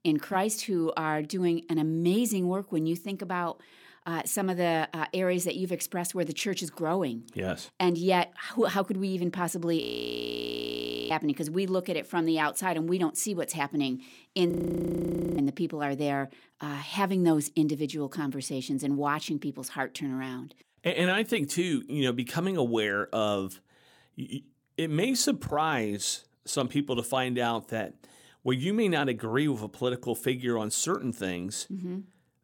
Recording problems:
audio freezing; at 10 s for 1.5 s and at 15 s for 1 s

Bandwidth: 17.5 kHz